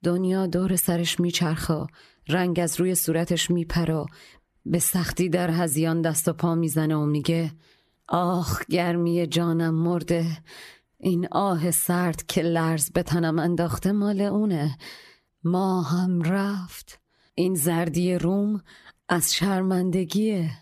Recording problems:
squashed, flat; somewhat

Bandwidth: 14 kHz